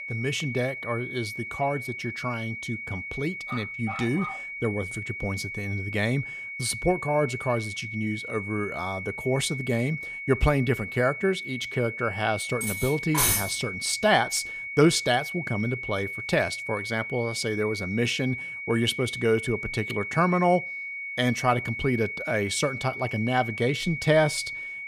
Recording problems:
high-pitched whine; loud; throughout; 2 kHz, 6 dB below the speech
dog barking; noticeable; at 3.5 s; peak 9 dB below the speech
clattering dishes; loud; at 13 s; peak 5 dB above the speech

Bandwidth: 15 kHz